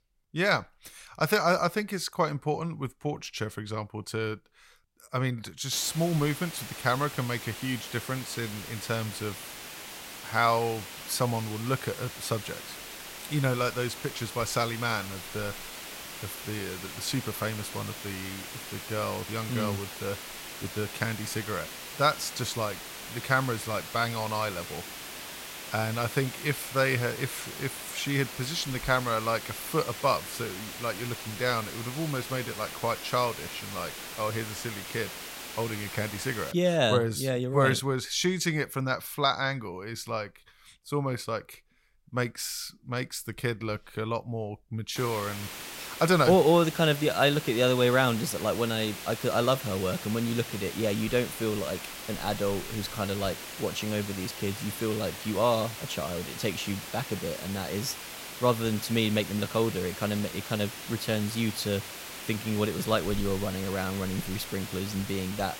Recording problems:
hiss; loud; from 5.5 to 37 s and from 45 s on; 9 dB below the speech

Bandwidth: 16 kHz